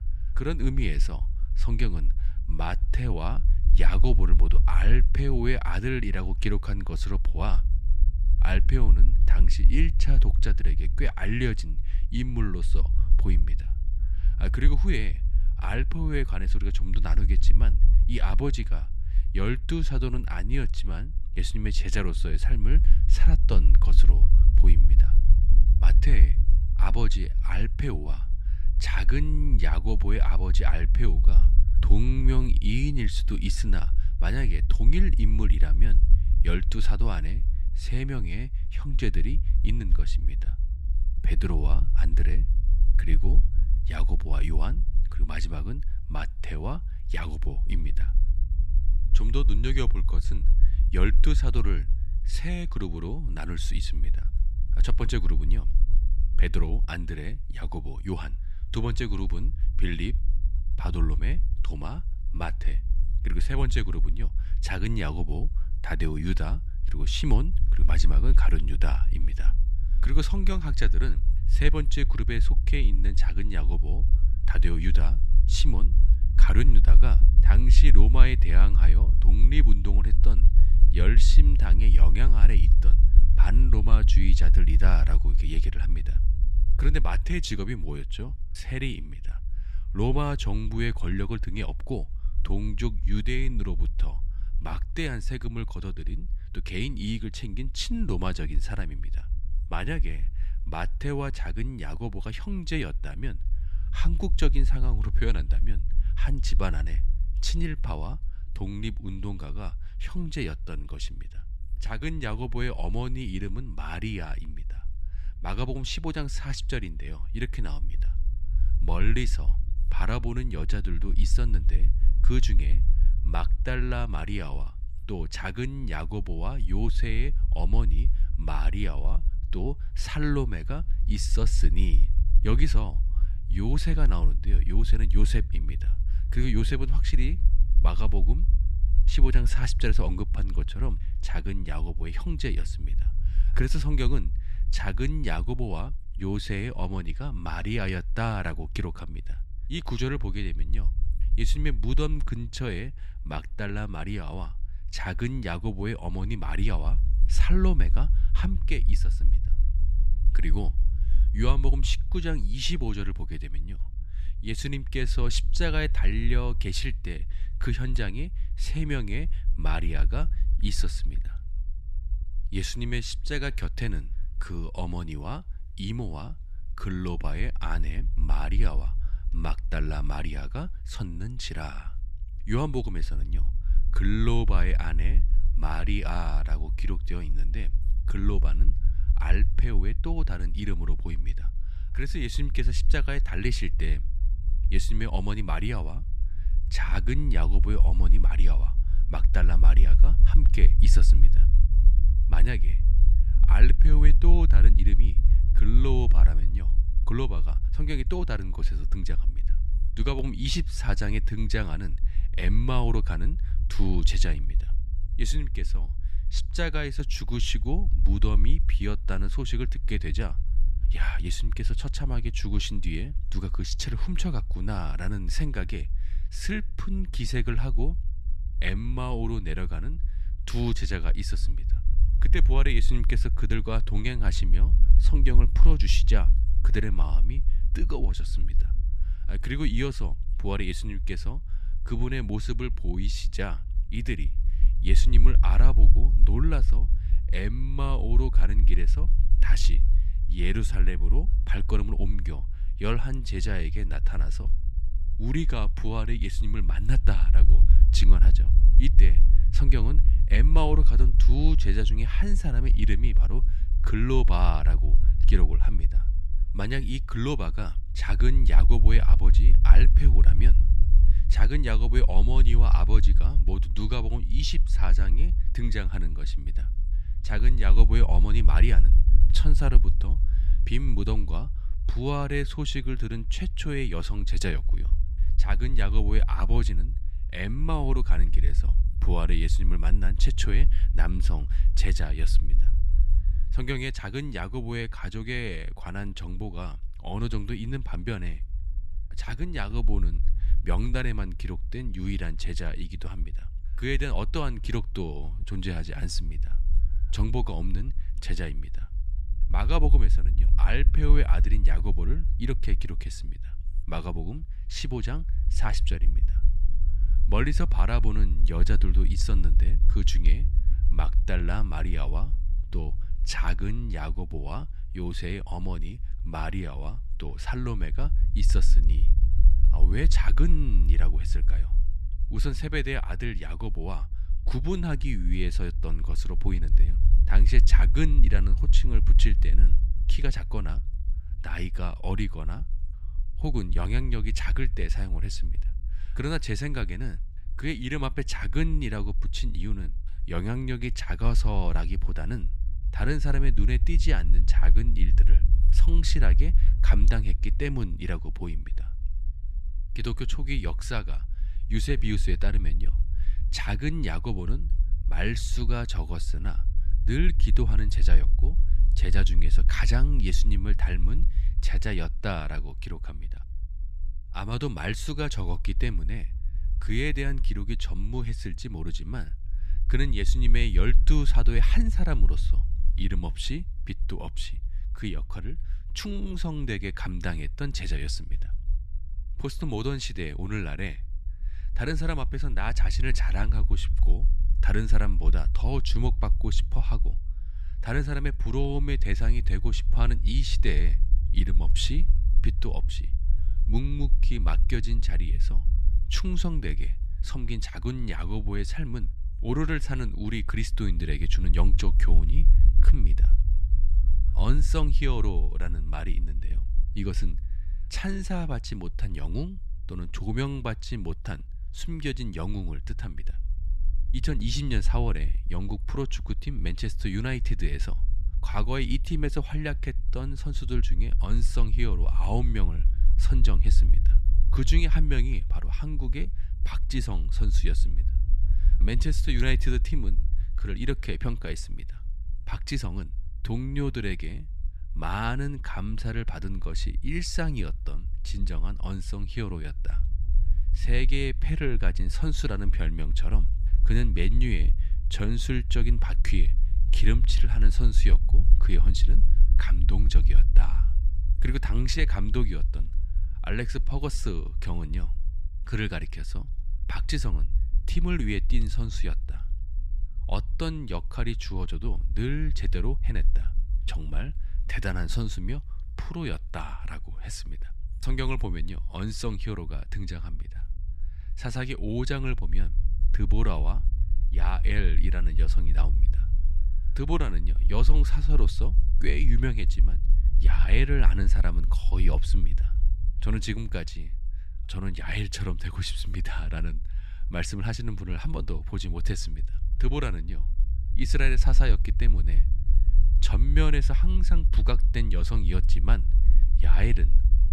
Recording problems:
low rumble; noticeable; throughout; 15 dB below the speech

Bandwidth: 14.5 kHz